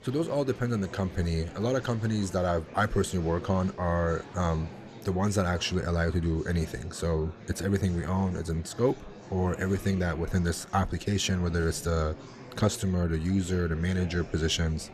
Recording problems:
murmuring crowd; noticeable; throughout; 15 dB below the speech

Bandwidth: 14 kHz